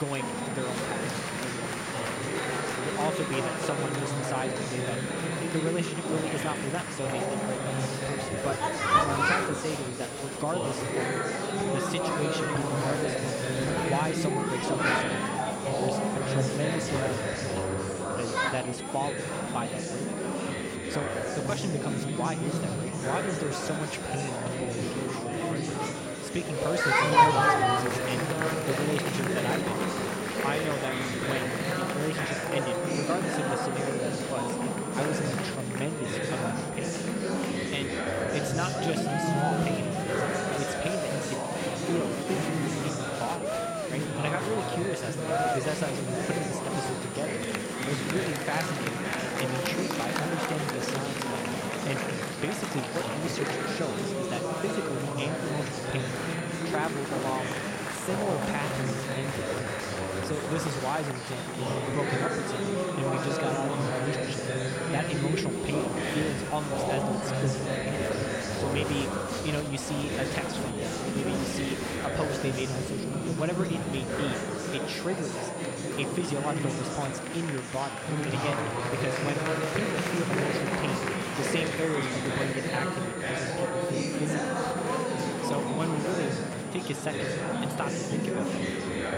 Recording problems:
murmuring crowd; very loud; throughout; 5 dB above the speech
high-pitched whine; loud; throughout; 9.5 kHz, 9 dB below the speech
crackling; noticeable; at 31 s and at 50 s; 15 dB below the speech
abrupt cut into speech; at the start

